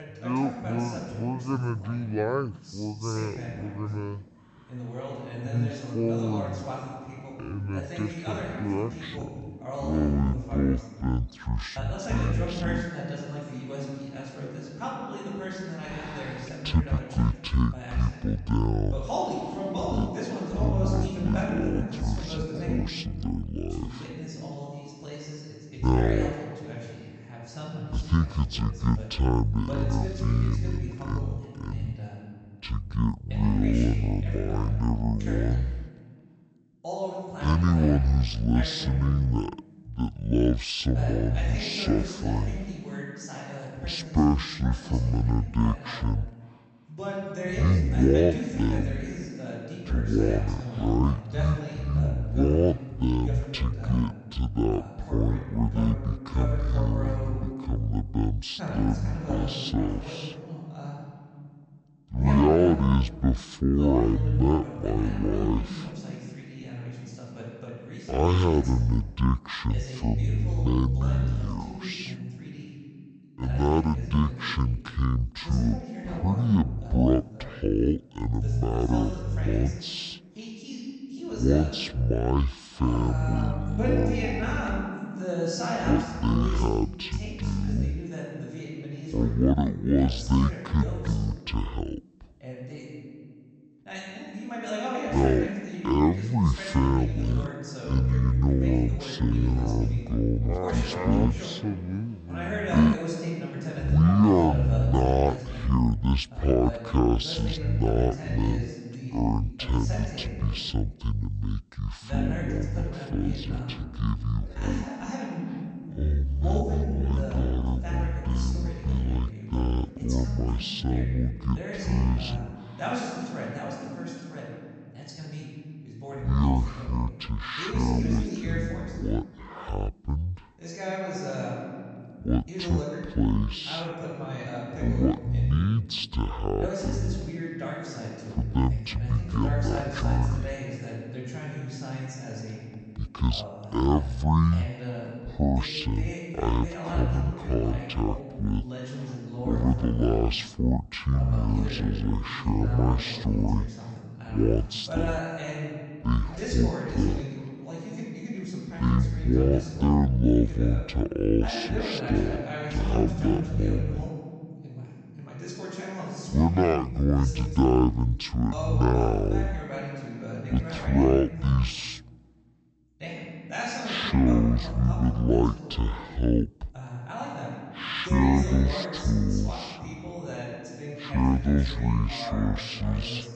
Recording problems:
wrong speed and pitch; too slow and too low; 0.5 times normal speed
voice in the background; loud; throughout; 9 dB below the speech

